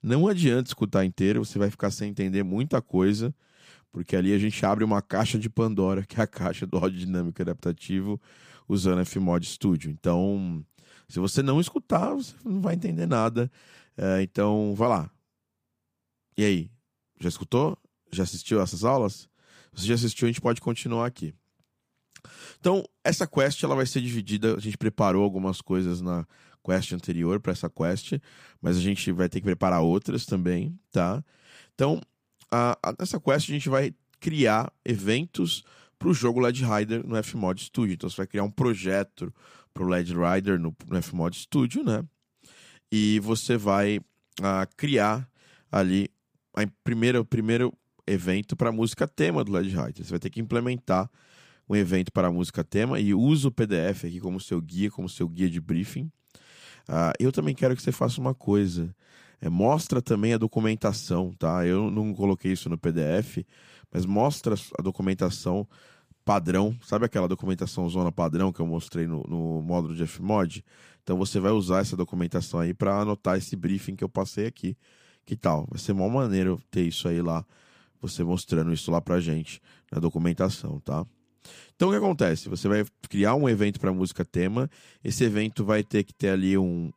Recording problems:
none

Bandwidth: 15 kHz